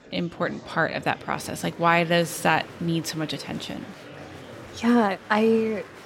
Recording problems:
murmuring crowd; noticeable; throughout; 20 dB below the speech

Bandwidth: 16.5 kHz